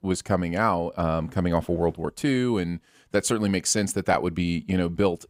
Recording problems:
none

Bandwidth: 15.5 kHz